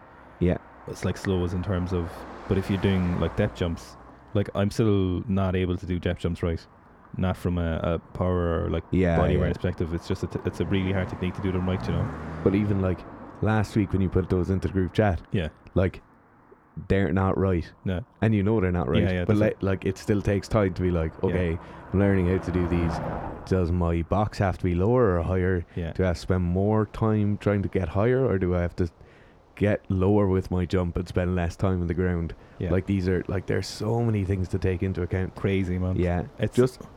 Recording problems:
muffled; slightly; fading above 2 kHz
traffic noise; noticeable; throughout; 15 dB below the speech

